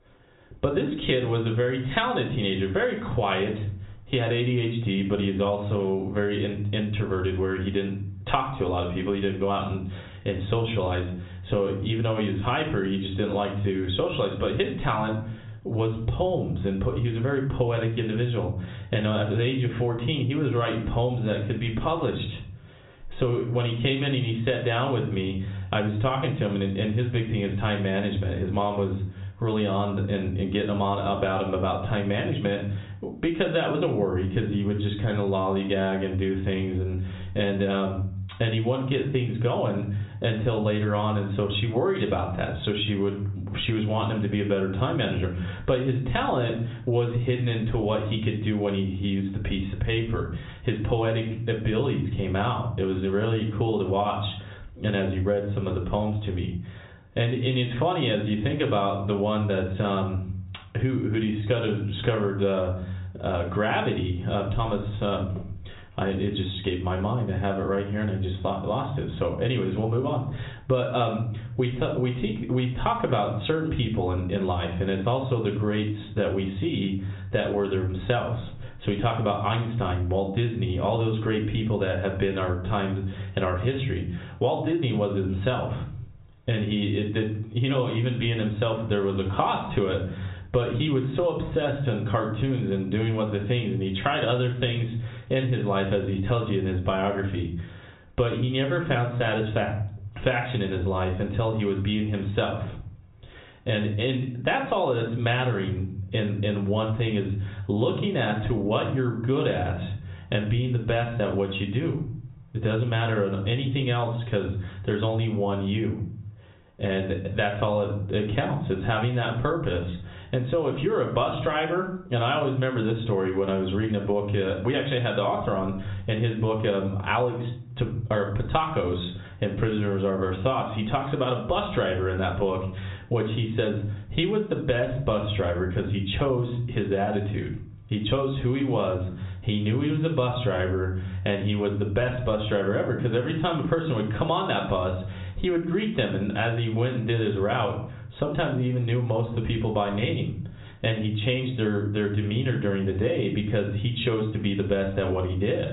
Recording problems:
high frequencies cut off; severe; nothing above 4 kHz
room echo; slight; dies away in 0.4 s
off-mic speech; somewhat distant
squashed, flat; somewhat

